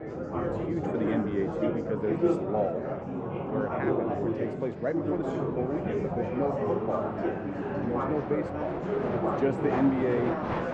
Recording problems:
muffled; very; fading above 2.5 kHz
murmuring crowd; very loud; throughout; 2 dB above the speech

